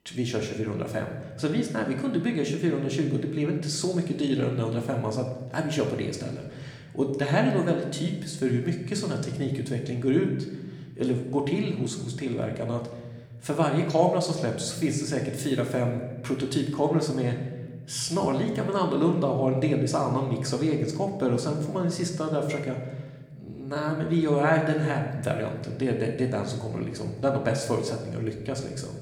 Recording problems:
room echo; slight; dies away in 1.1 s
off-mic speech; somewhat distant

